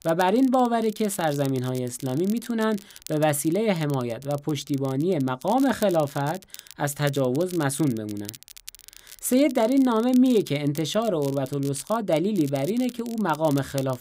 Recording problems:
crackle, like an old record; noticeable; 20 dB below the speech

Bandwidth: 15.5 kHz